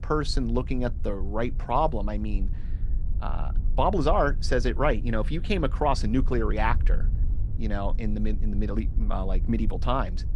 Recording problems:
low rumble; faint; throughout; 20 dB below the speech

